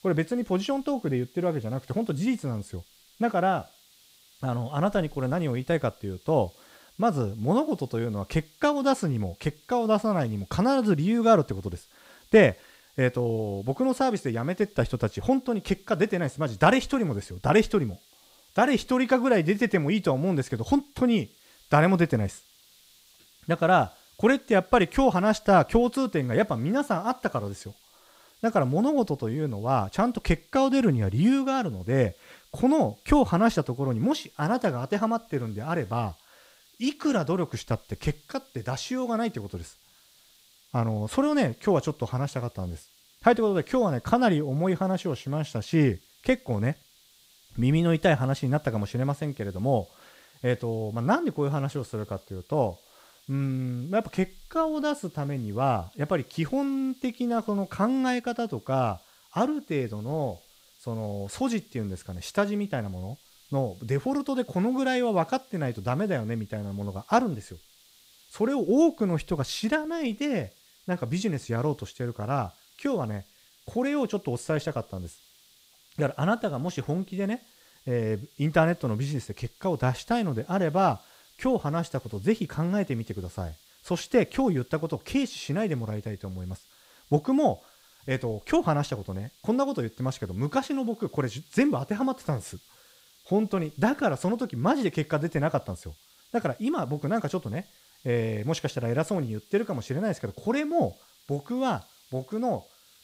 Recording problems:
hiss; faint; throughout; 30 dB below the speech

